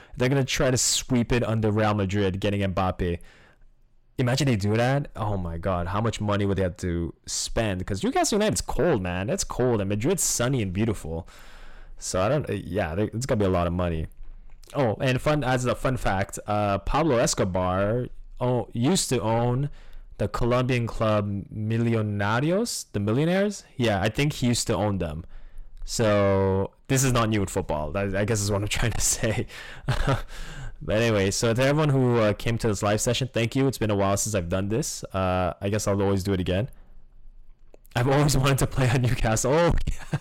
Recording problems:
distortion; heavy; 7 dB below the speech

